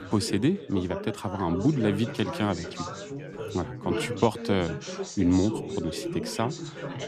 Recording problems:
background chatter; loud; throughout; 4 voices, 7 dB below the speech

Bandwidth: 14.5 kHz